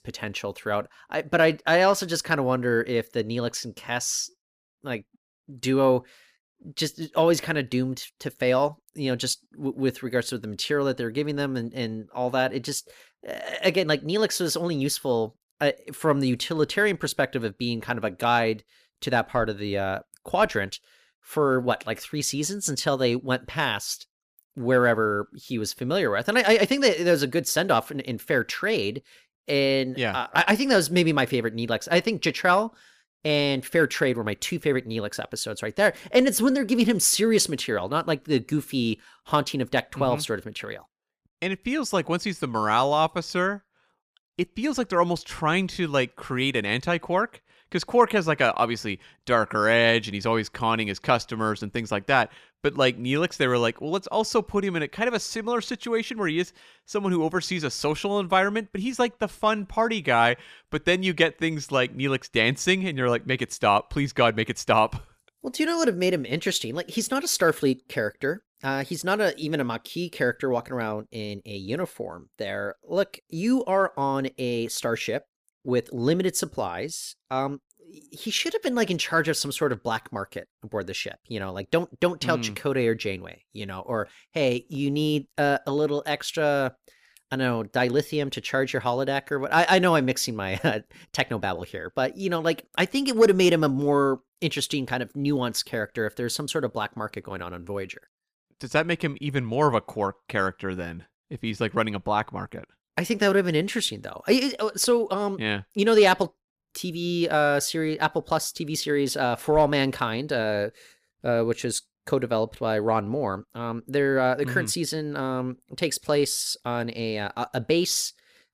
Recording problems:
none

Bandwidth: 15 kHz